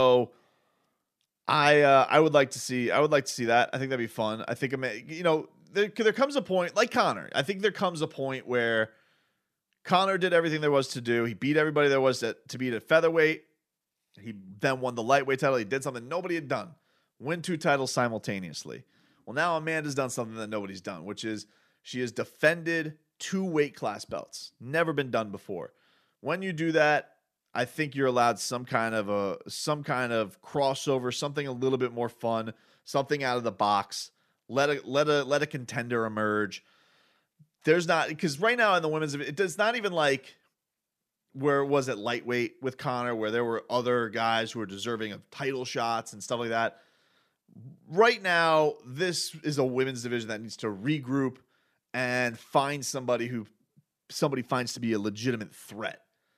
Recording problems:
abrupt cut into speech; at the start

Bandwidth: 14.5 kHz